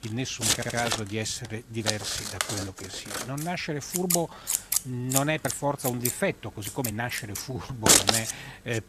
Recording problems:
household noises; very loud; throughout; 5 dB above the speech
uneven, jittery; strongly; from 0.5 to 7.5 s
audio stuttering; at 0.5 s

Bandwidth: 14.5 kHz